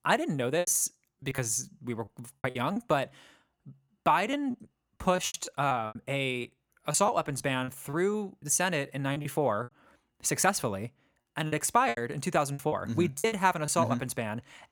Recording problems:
choppy; very; 12% of the speech affected

